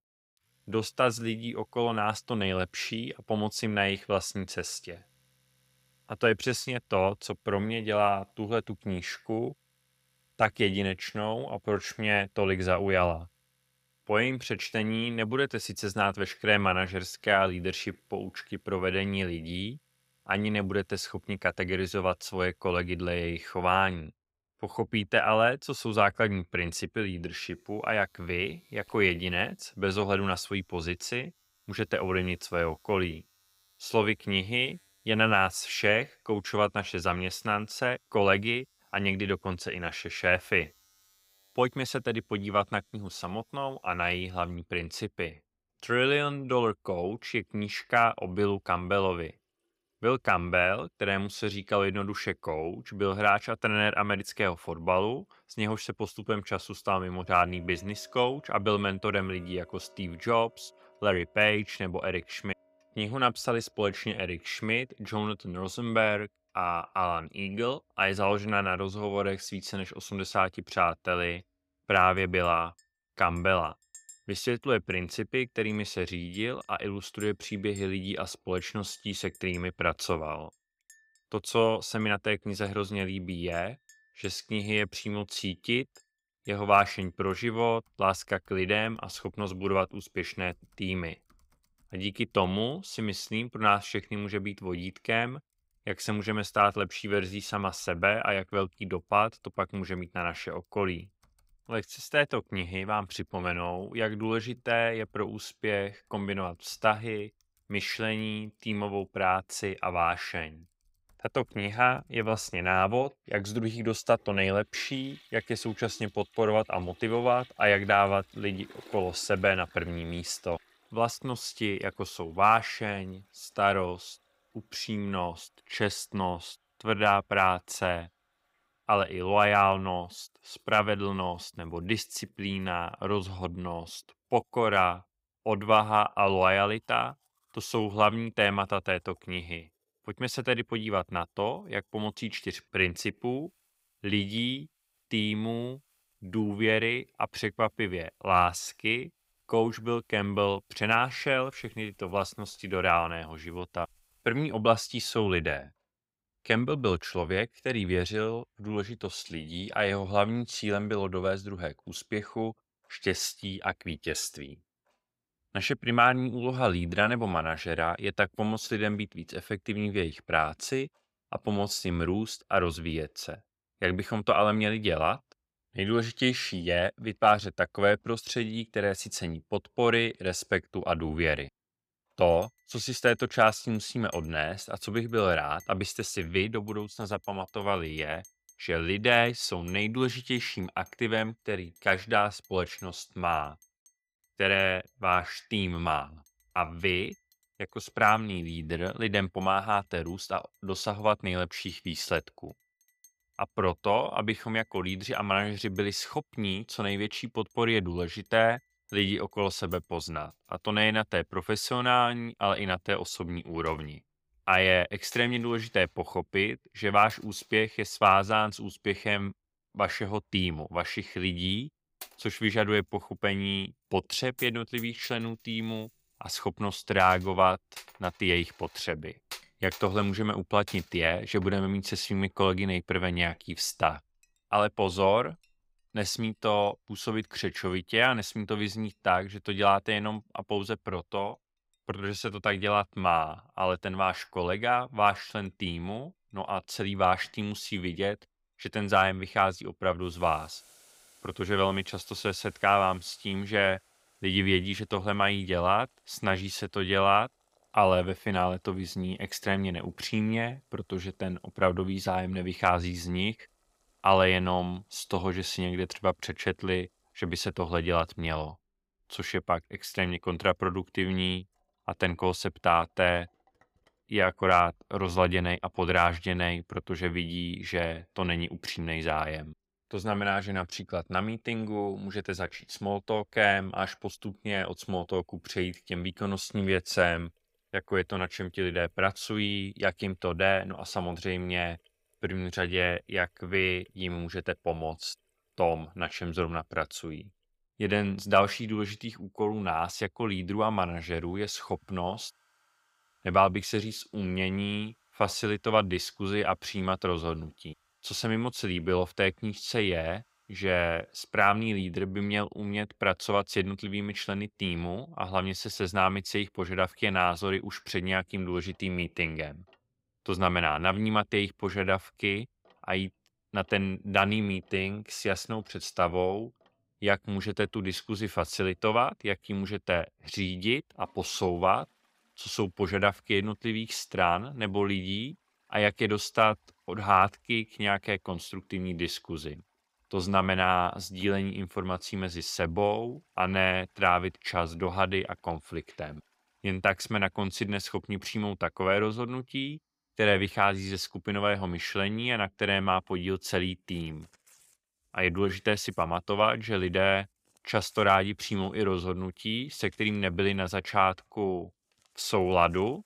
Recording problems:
household noises; faint; throughout; 30 dB below the speech

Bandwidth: 15.5 kHz